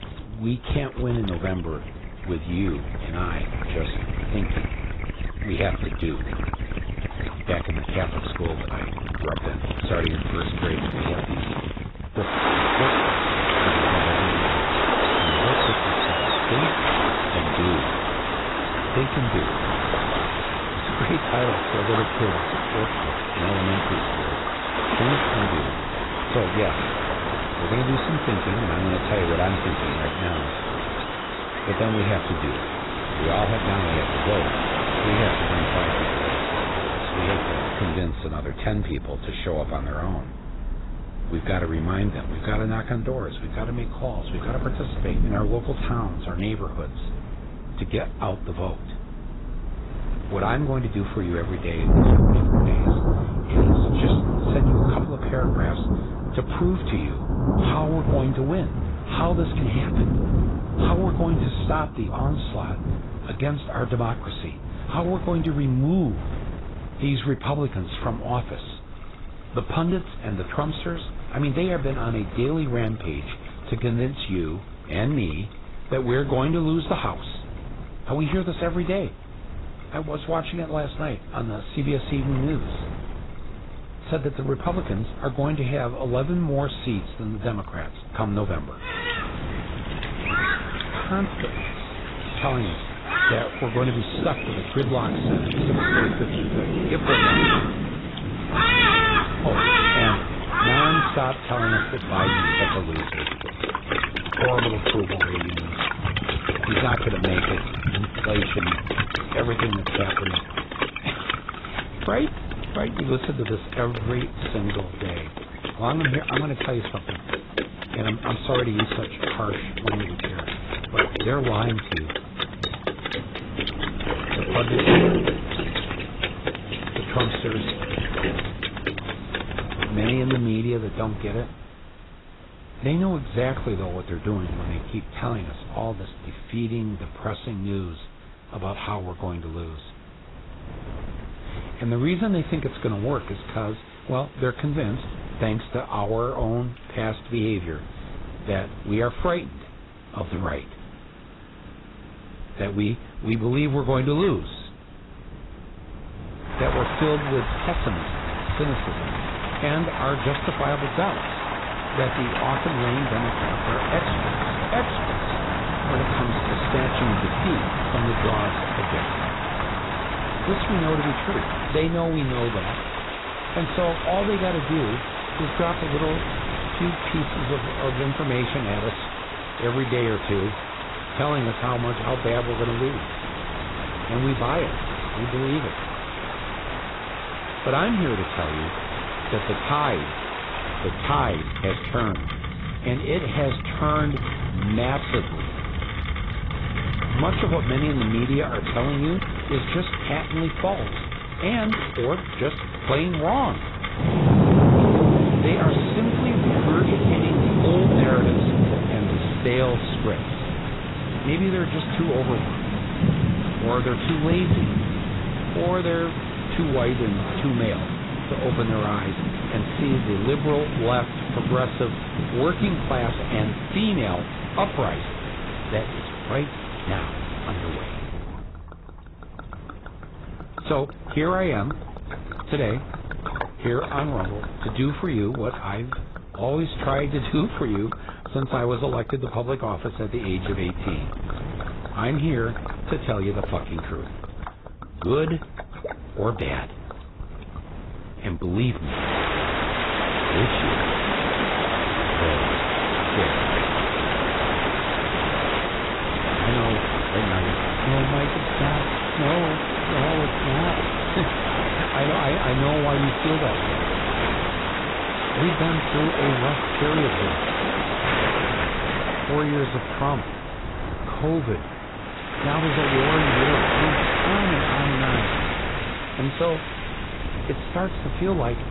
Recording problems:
garbled, watery; badly; nothing above 4 kHz
distortion; slight; 10 dB below the speech
rain or running water; very loud; throughout; 1 dB above the speech
wind noise on the microphone; occasional gusts; 15 dB below the speech

